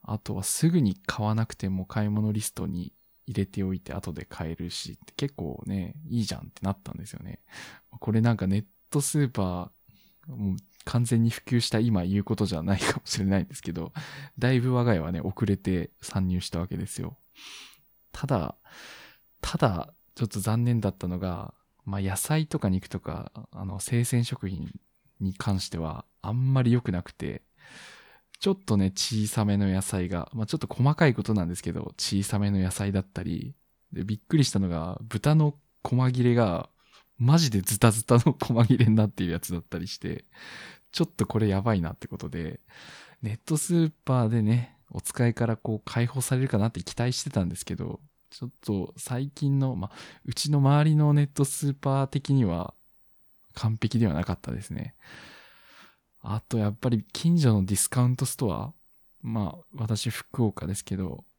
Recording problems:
none

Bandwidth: 18.5 kHz